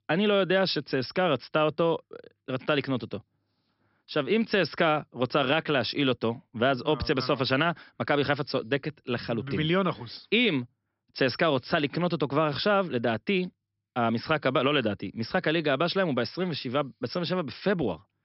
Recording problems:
high frequencies cut off; noticeable; nothing above 5.5 kHz

